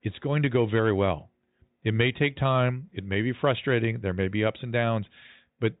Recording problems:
high frequencies cut off; severe; nothing above 4 kHz

